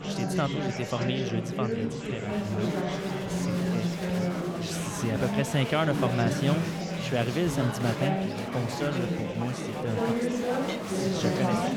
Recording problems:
chatter from many people; very loud; throughout; 1 dB above the speech

